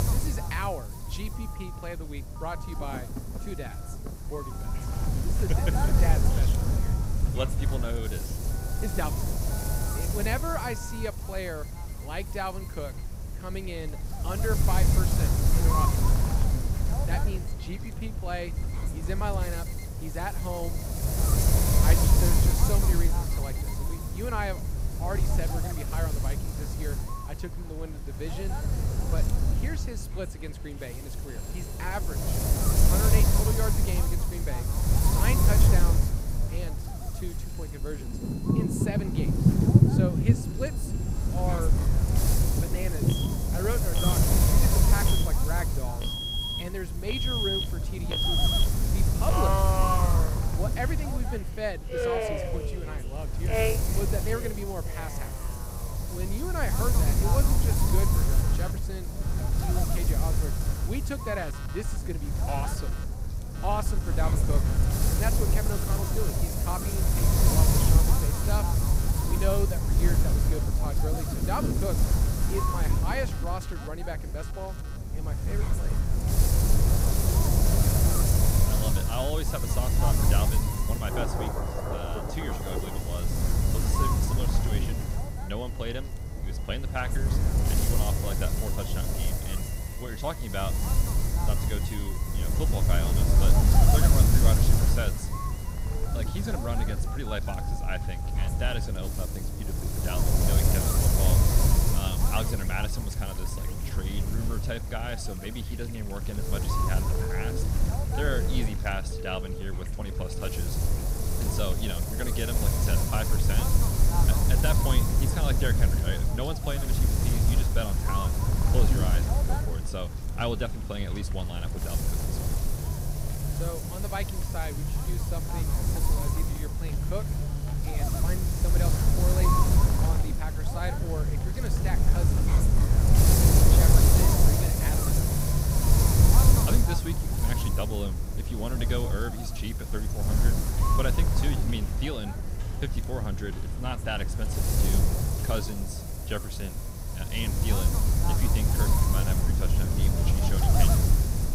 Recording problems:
rain or running water; very loud; throughout; 4 dB above the speech
wind noise on the microphone; heavy; 1 dB above the speech
alarms or sirens; loud; throughout; 2 dB below the speech

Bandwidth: 15.5 kHz